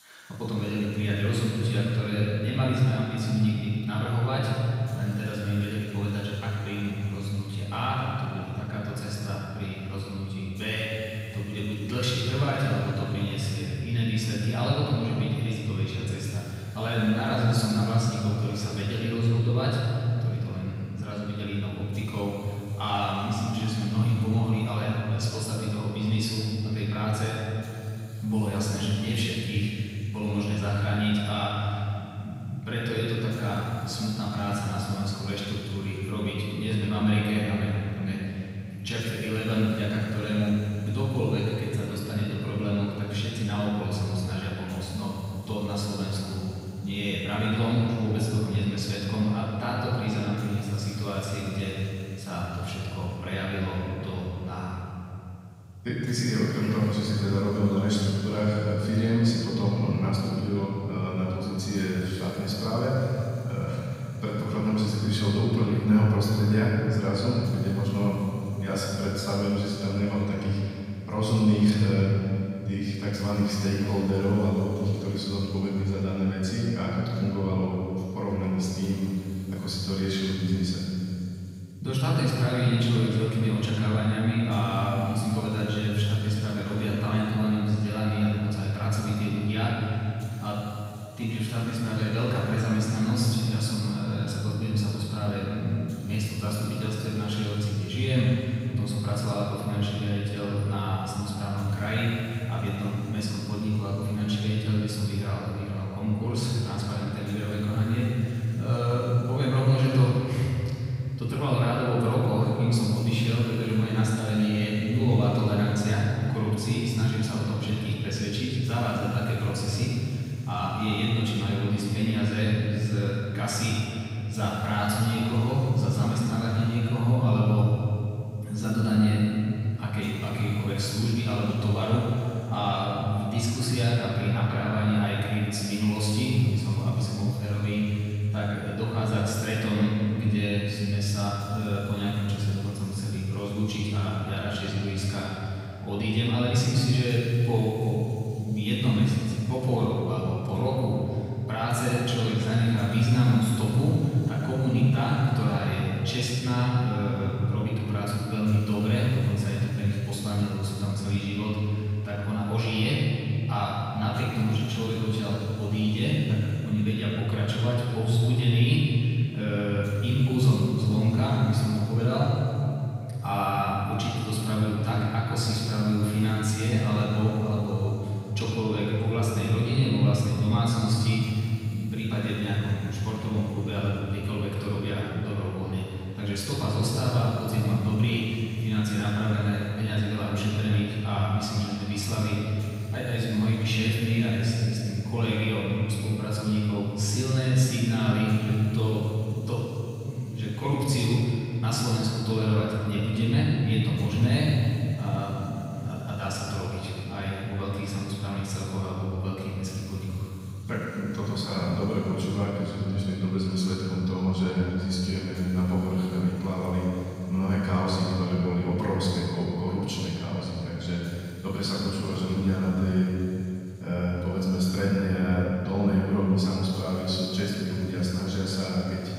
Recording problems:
room echo; strong; dies away in 3 s
off-mic speech; far
hiss; very faint; throughout; 30 dB below the speech

